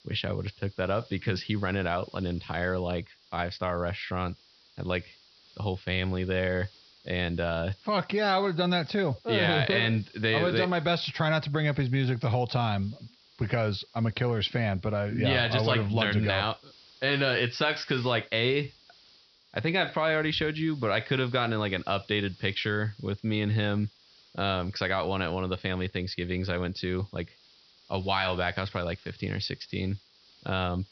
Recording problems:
high frequencies cut off; noticeable; nothing above 5.5 kHz
hiss; faint; throughout; 25 dB below the speech

